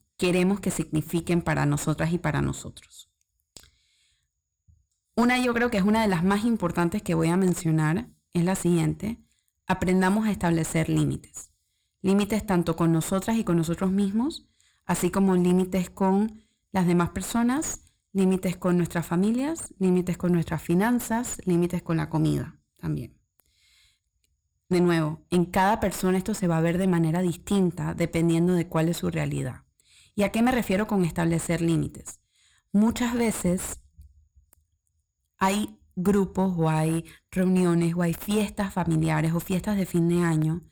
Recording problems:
distortion; slight; 10 dB below the speech

